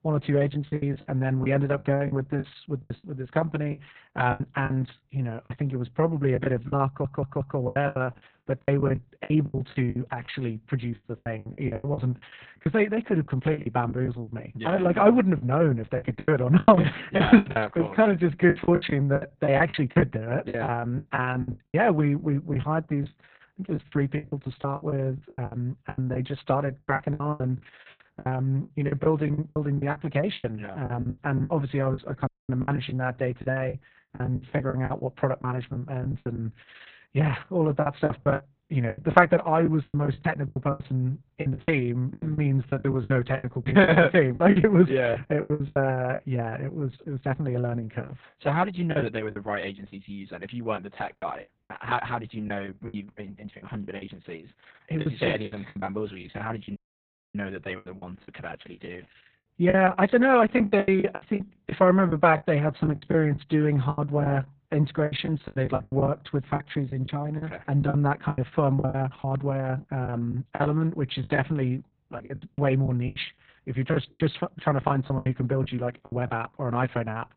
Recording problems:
garbled, watery; badly; nothing above 4 kHz
muffled; very slightly; fading above 4 kHz
choppy; very; 15% of the speech affected
audio stuttering; at 7 s
audio cutting out; at 32 s and at 57 s for 0.5 s

